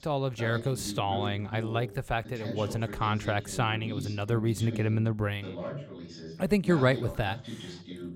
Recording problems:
voice in the background; noticeable; throughout; 10 dB below the speech

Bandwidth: 16 kHz